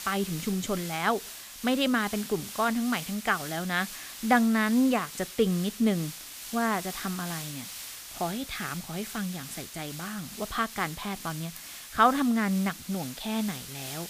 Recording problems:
hiss; noticeable; throughout; 10 dB below the speech

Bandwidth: 15 kHz